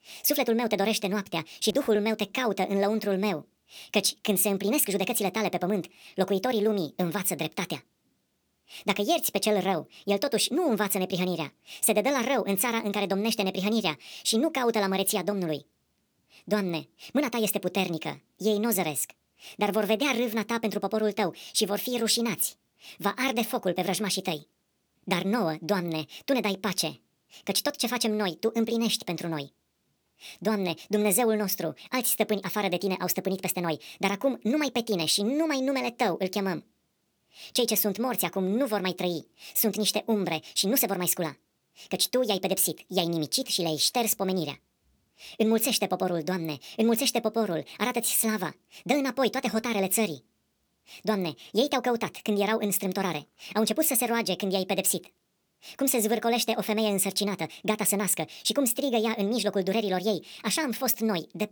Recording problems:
wrong speed and pitch; too fast and too high; 1.5 times normal speed

